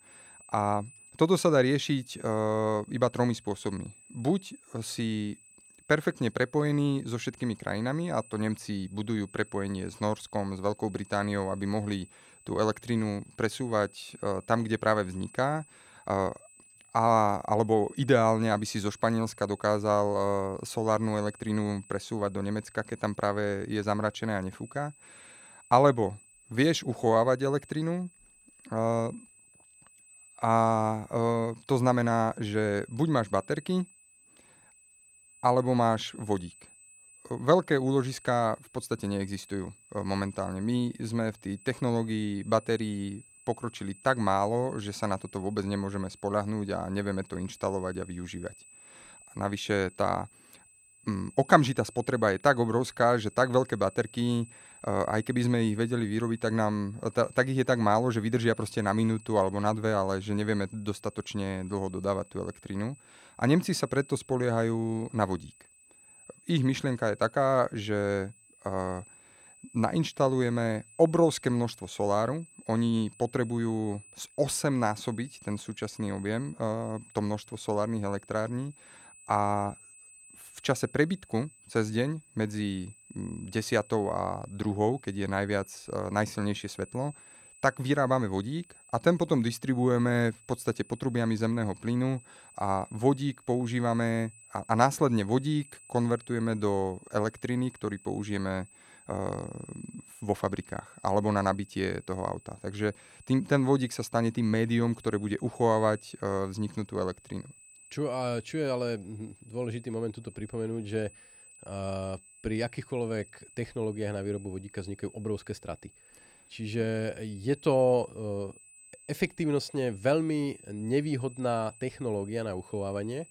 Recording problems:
high-pitched whine; faint; throughout; 8 kHz, 25 dB below the speech

